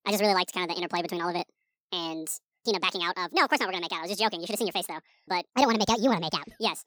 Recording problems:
wrong speed and pitch; too fast and too high; 1.7 times normal speed

